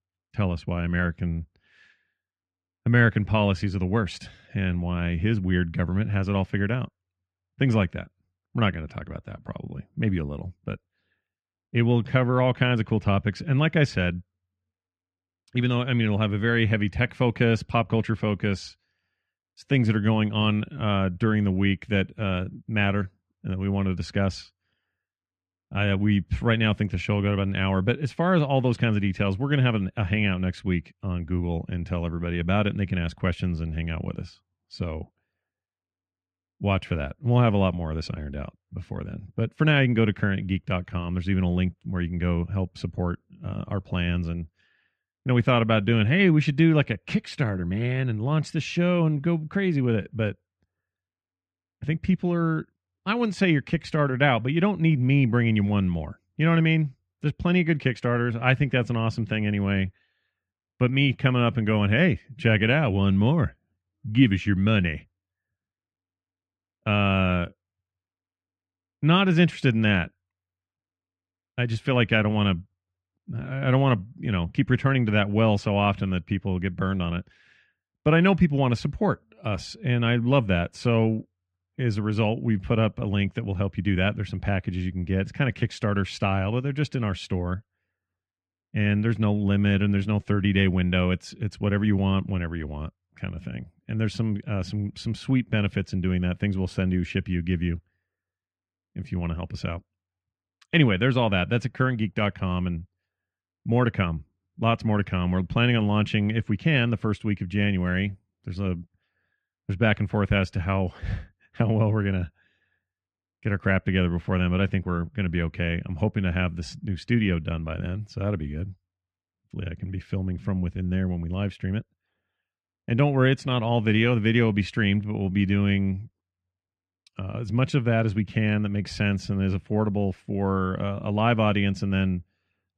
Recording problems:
muffled; very; fading above 2 kHz

